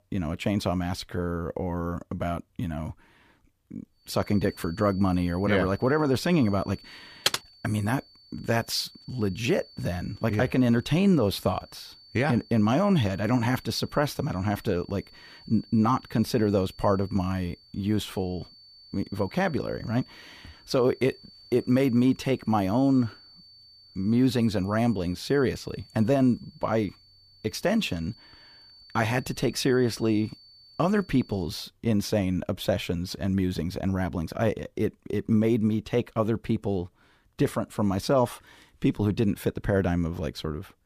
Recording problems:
high-pitched whine; faint; from 4 to 31 s; 4.5 kHz, 25 dB below the speech
keyboard typing; noticeable; at 7.5 s; peak level with the speech

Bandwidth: 15 kHz